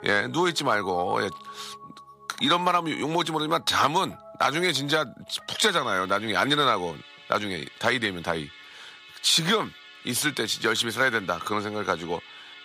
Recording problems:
thin; somewhat; fading below 950 Hz
background music; noticeable; throughout; 20 dB below the speech

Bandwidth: 15 kHz